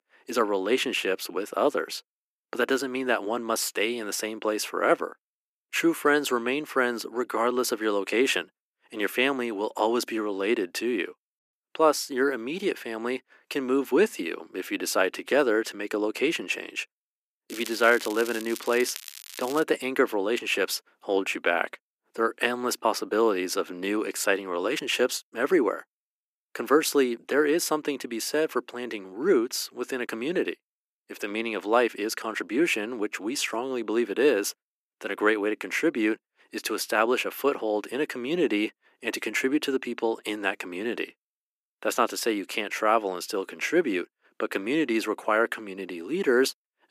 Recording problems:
thin; somewhat; fading below 300 Hz
crackling; noticeable; from 17 to 20 s; 15 dB below the speech

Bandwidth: 14.5 kHz